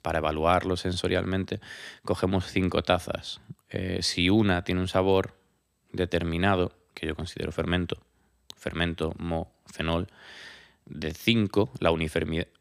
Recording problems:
none

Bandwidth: 15 kHz